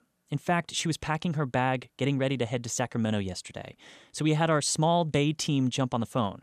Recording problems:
none

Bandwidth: 14 kHz